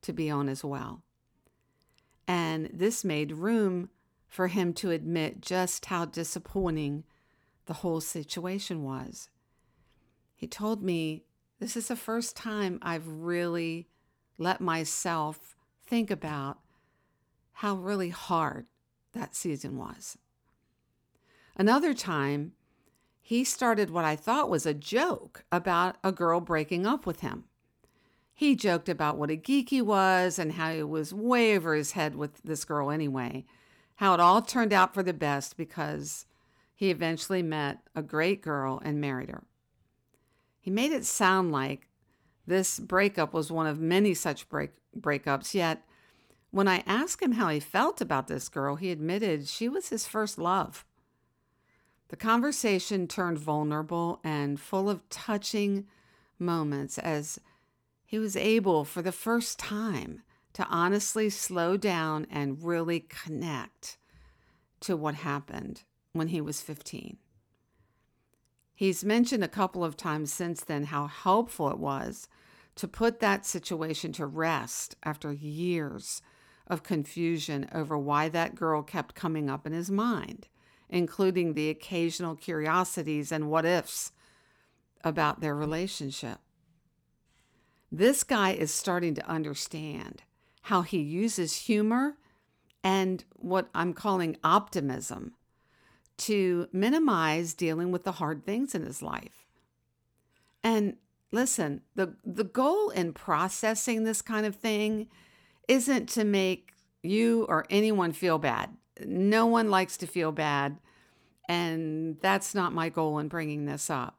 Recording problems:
none

